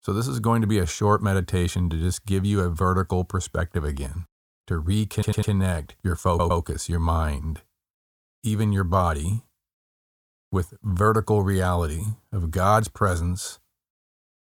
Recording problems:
audio stuttering; at 5 s and at 6.5 s

